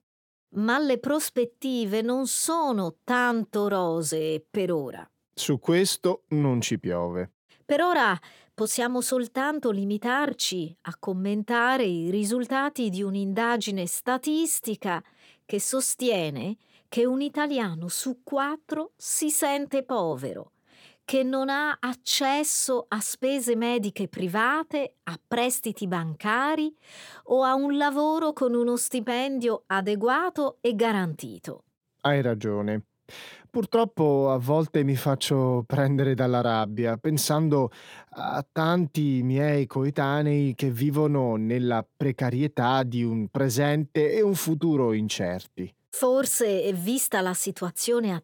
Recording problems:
none

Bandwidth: 18 kHz